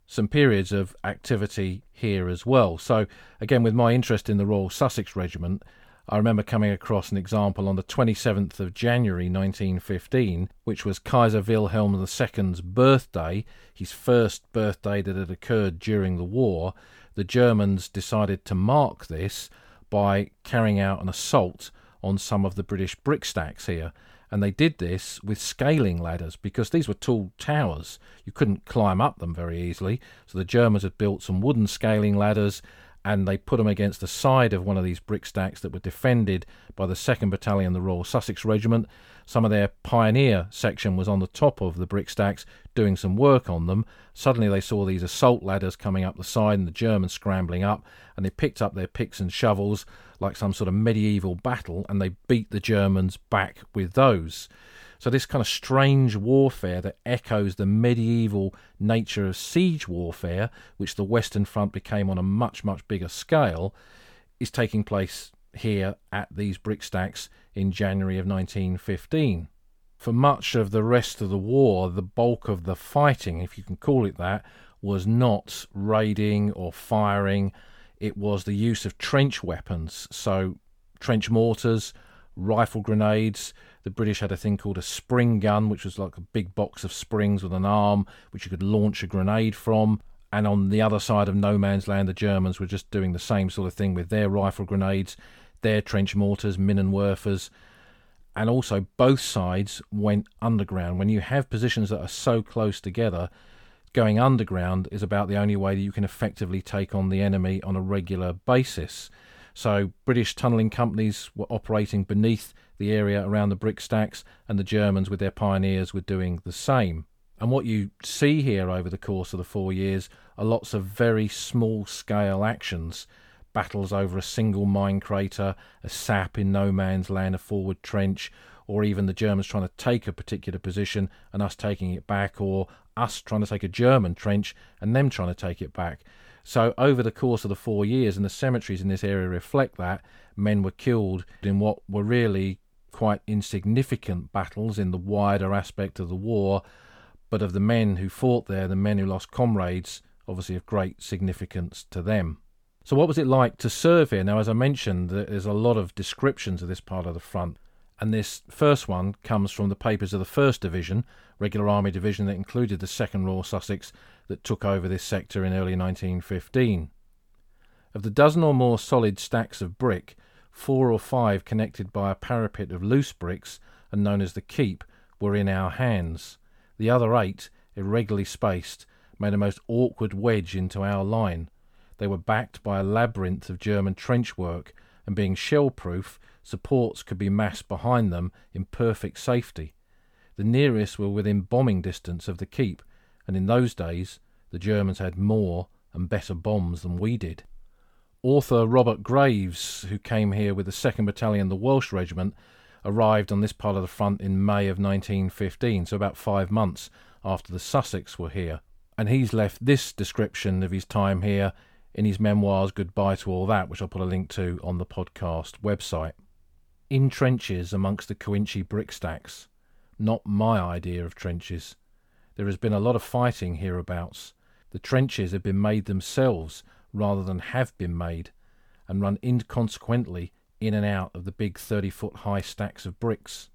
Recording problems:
none

